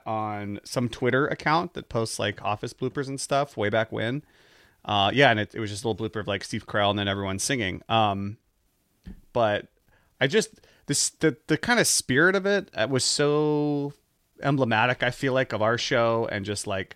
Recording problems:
none

